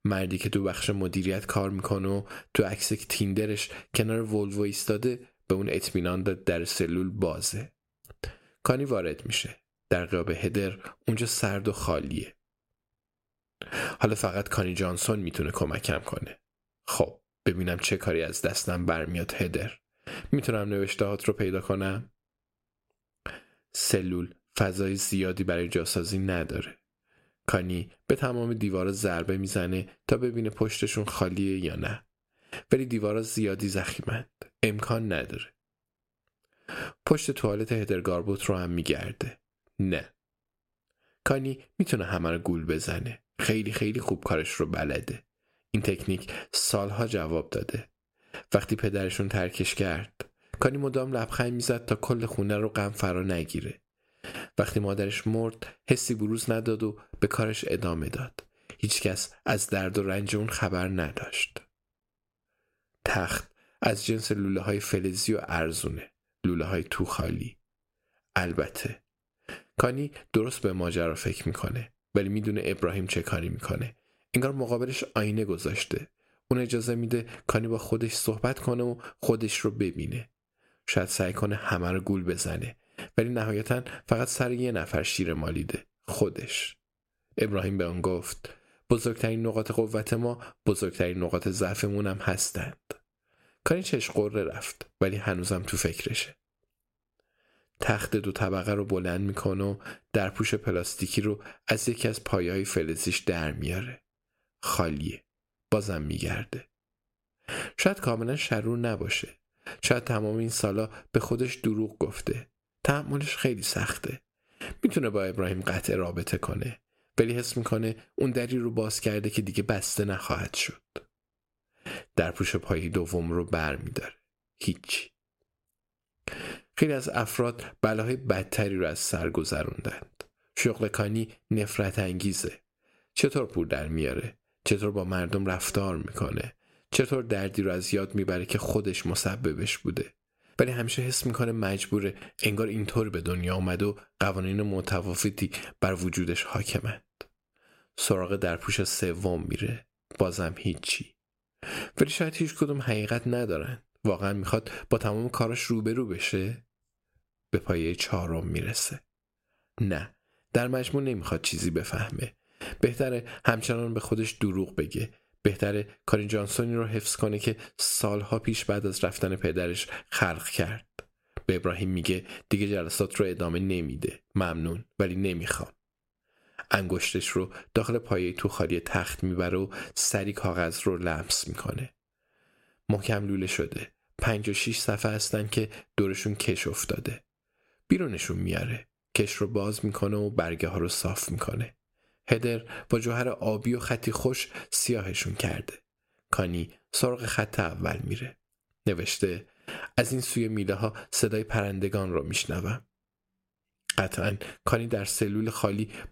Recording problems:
squashed, flat; somewhat

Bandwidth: 16 kHz